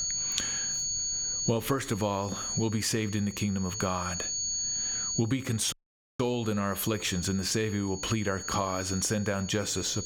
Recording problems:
squashed, flat; somewhat
high-pitched whine; loud; throughout; 6.5 kHz, 2 dB below the speech
audio cutting out; at 5.5 s

